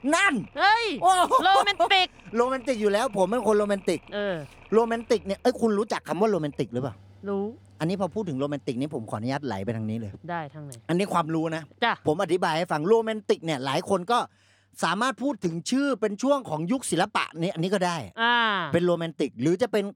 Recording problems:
machinery noise; faint; throughout; 25 dB below the speech

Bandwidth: 18.5 kHz